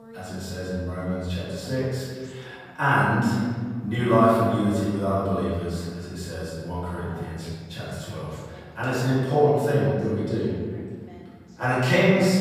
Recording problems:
room echo; strong; dies away in 1.8 s
off-mic speech; far
voice in the background; faint; throughout; 25 dB below the speech

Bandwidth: 15 kHz